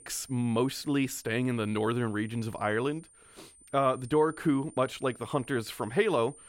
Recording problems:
high-pitched whine; faint; throughout; 9 kHz, 20 dB below the speech

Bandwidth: 16 kHz